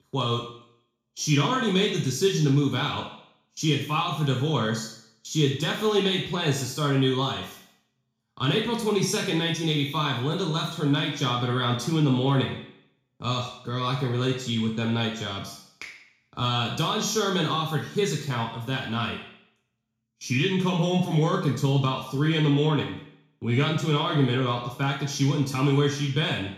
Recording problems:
off-mic speech; far
room echo; noticeable; dies away in 0.6 s

